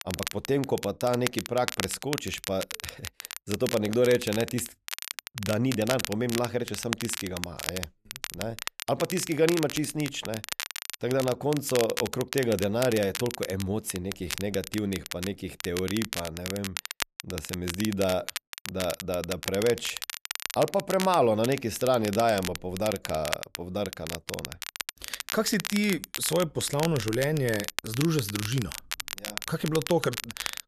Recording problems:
crackle, like an old record; loud; 7 dB below the speech

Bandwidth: 14 kHz